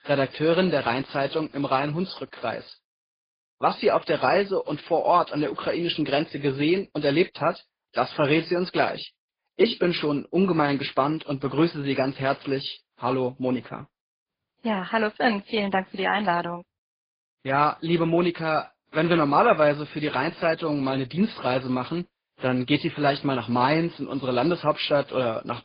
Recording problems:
garbled, watery; badly; nothing above 5 kHz

